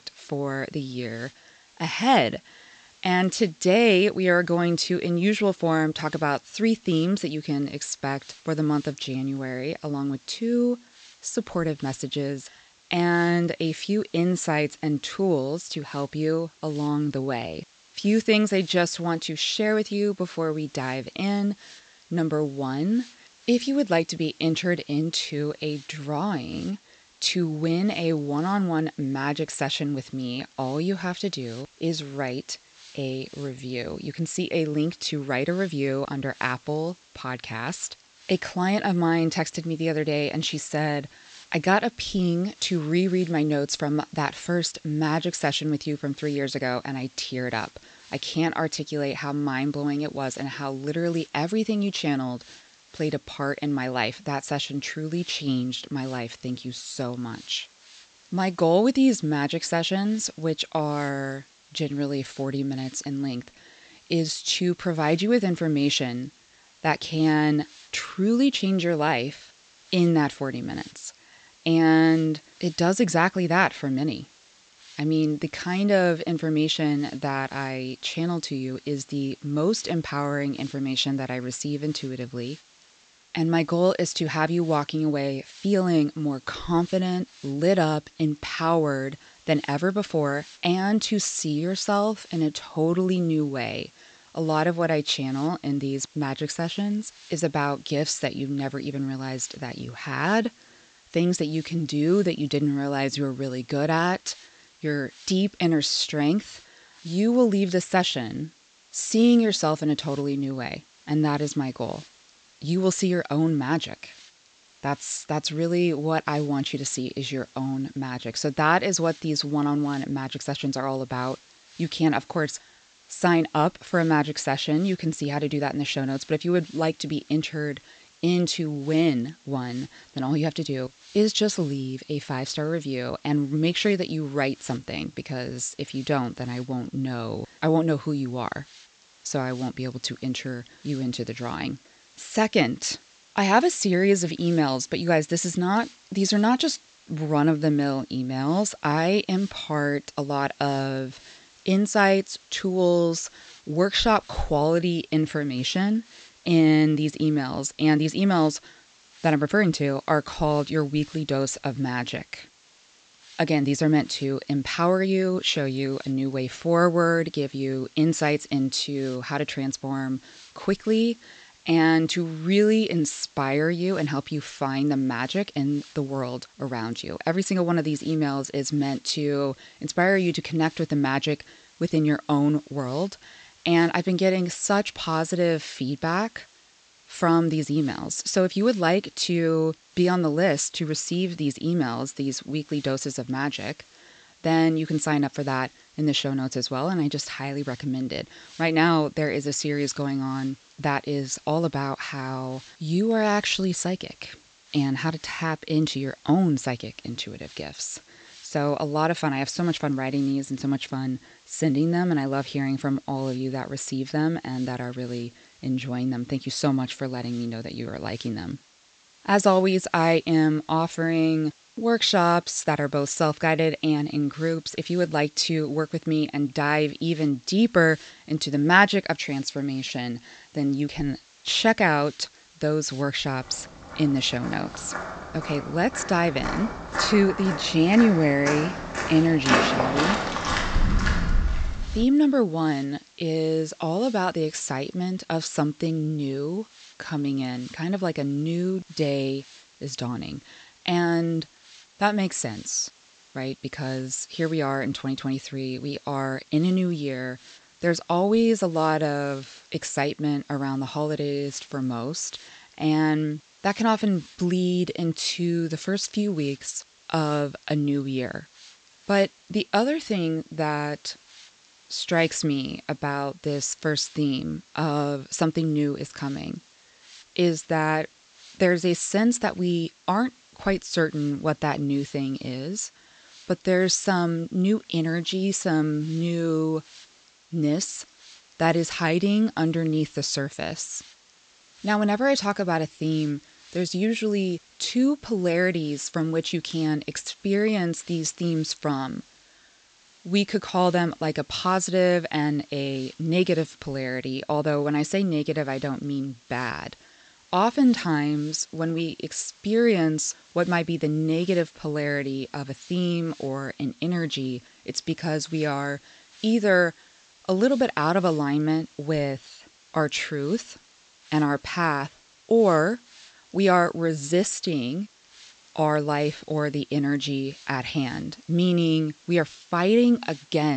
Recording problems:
high frequencies cut off; noticeable; nothing above 8 kHz
hiss; faint; throughout; 25 dB below the speech
footsteps; loud; from 3:55 to 4:02; peak 5 dB above the speech
abrupt cut into speech; at the end

